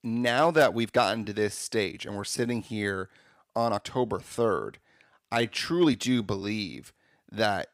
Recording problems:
uneven, jittery; strongly; from 1 to 6.5 s

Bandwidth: 15.5 kHz